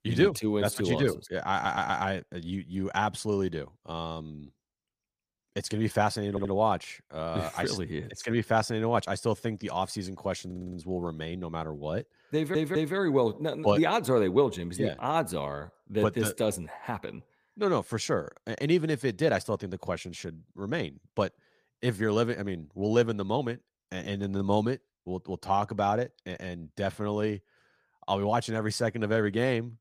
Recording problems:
audio stuttering; 4 times, first at 1.5 s

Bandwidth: 15 kHz